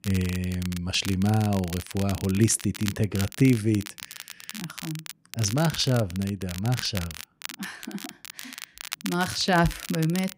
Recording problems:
crackle, like an old record; noticeable; 10 dB below the speech

